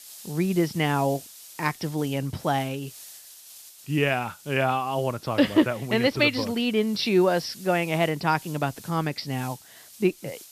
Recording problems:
high frequencies cut off; noticeable; nothing above 5.5 kHz
hiss; noticeable; throughout; 20 dB below the speech

